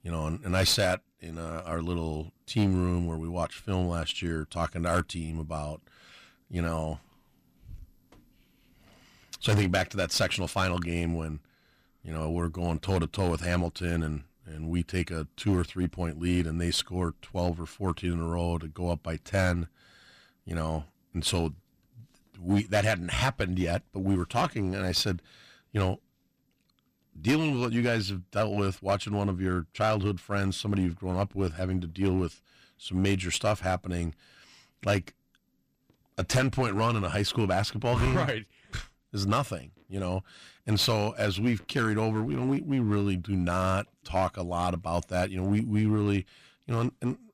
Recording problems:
distortion; slight; 5% of the sound clipped

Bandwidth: 15 kHz